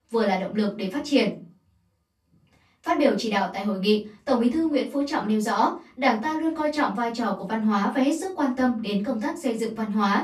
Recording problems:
off-mic speech; far
room echo; slight; dies away in 0.3 s

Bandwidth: 13.5 kHz